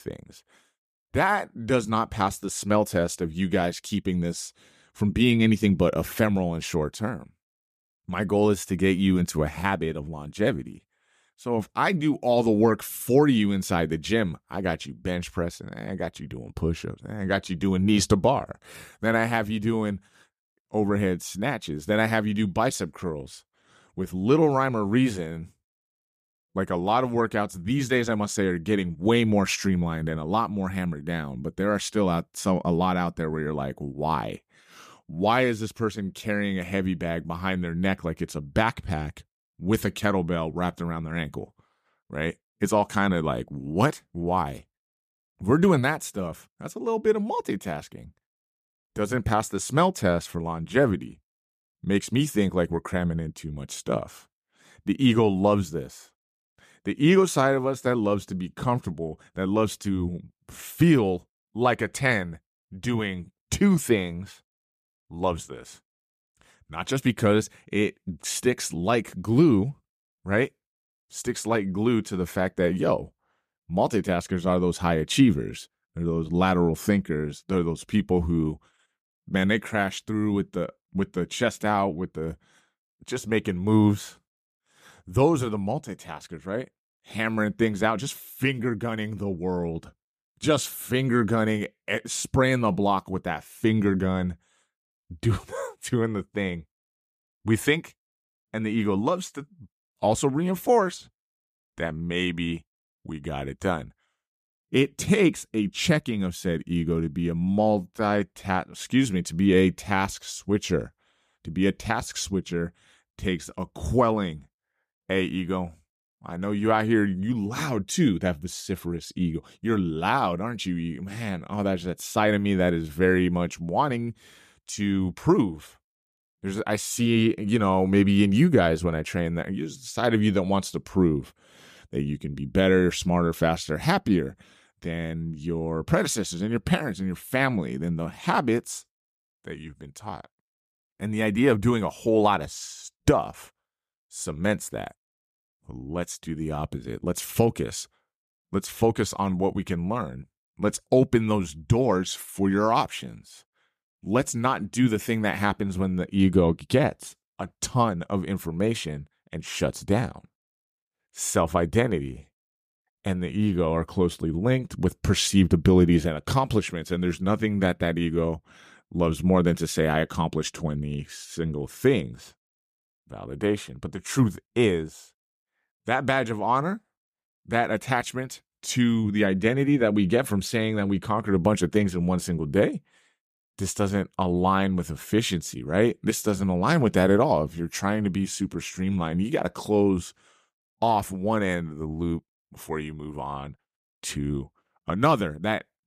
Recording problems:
none

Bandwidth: 14.5 kHz